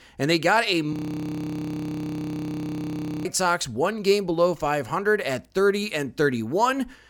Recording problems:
audio freezing; at 1 s for 2.5 s

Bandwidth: 17.5 kHz